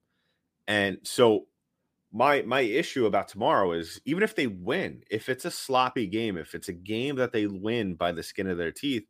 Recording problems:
none

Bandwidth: 15 kHz